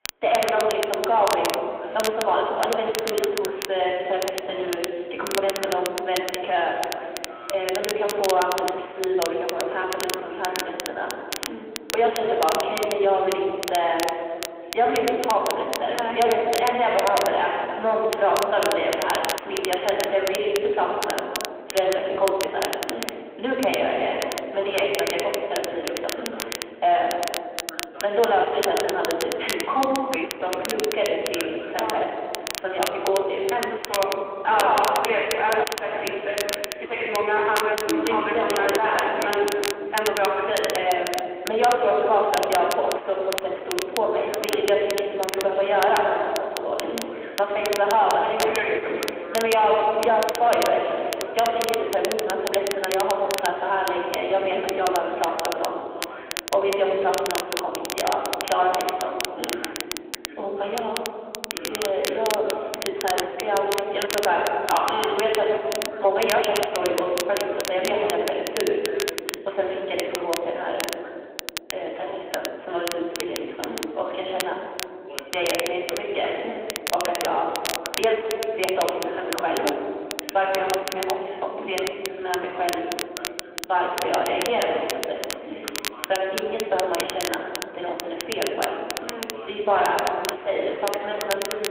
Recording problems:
room echo; noticeable; dies away in 2 s
phone-call audio
distortion; slight; 10 dB below the speech
off-mic speech; somewhat distant
crackle, like an old record; loud; 8 dB below the speech
voice in the background; noticeable; throughout; 20 dB below the speech

